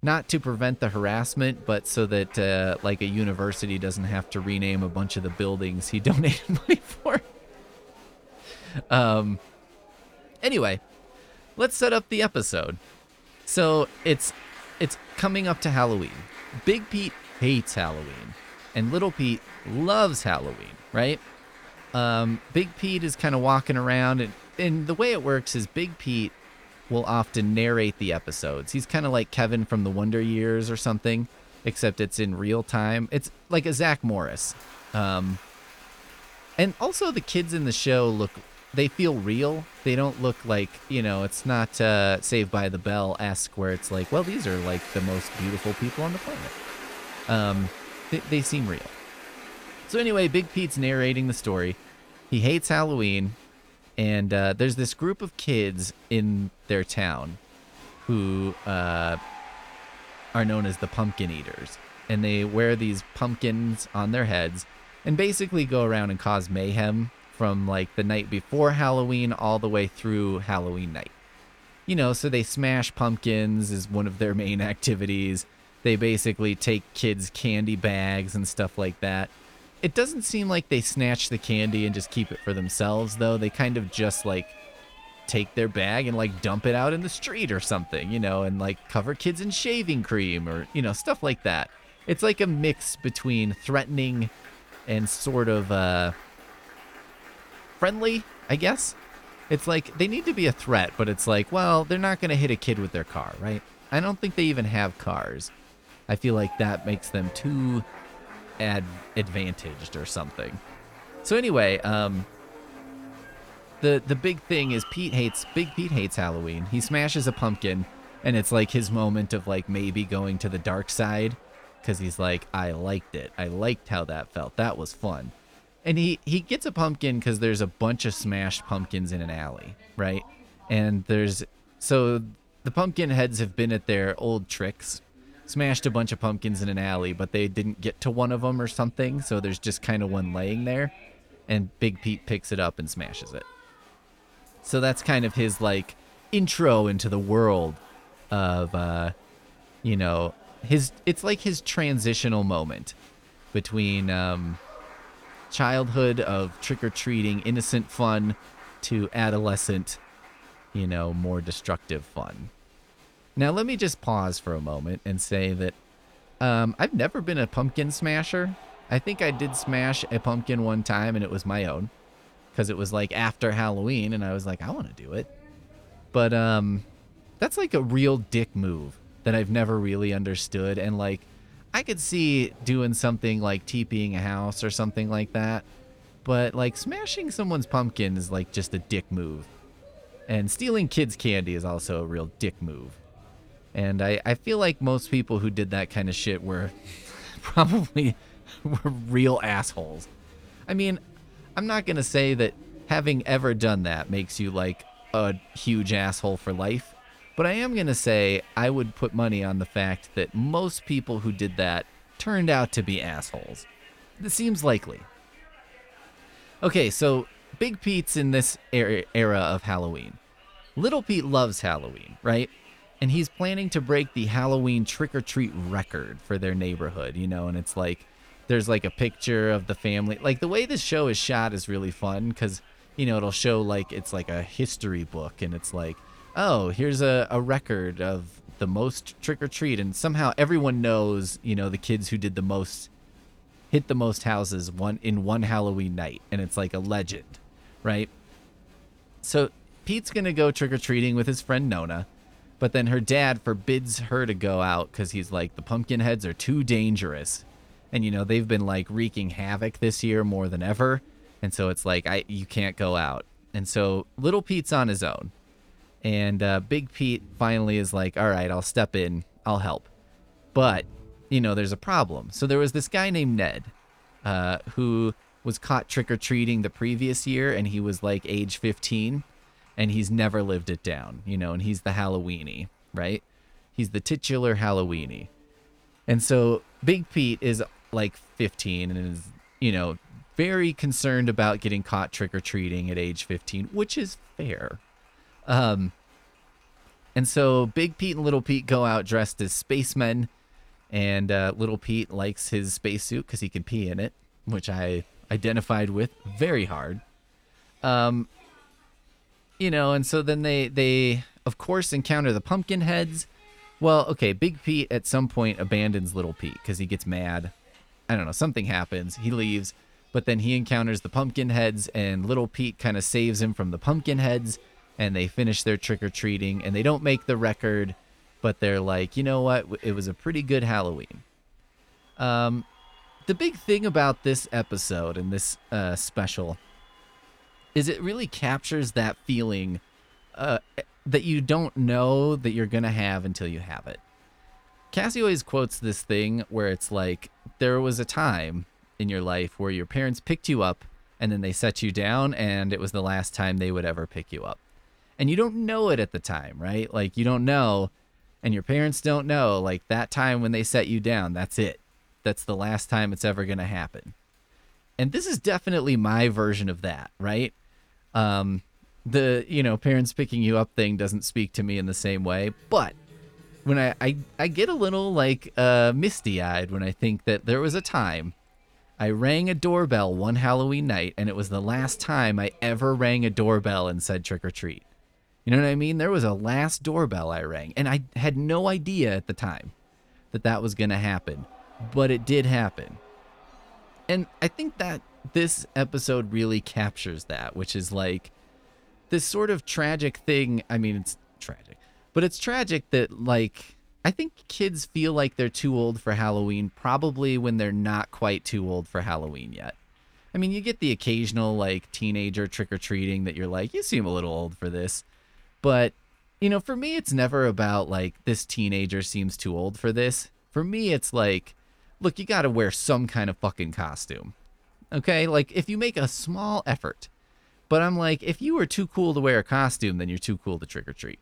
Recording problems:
crowd noise; faint; throughout; 25 dB below the speech

